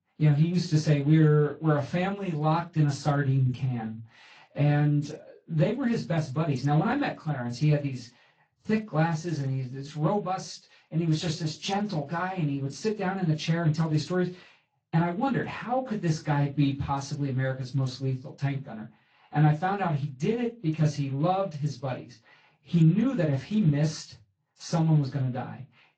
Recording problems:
off-mic speech; far
room echo; very slight; dies away in 0.2 s
garbled, watery; slightly; nothing above 7.5 kHz

